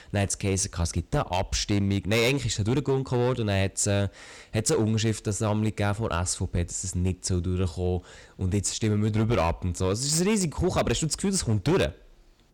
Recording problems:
distortion; slight; 7% of the sound clipped

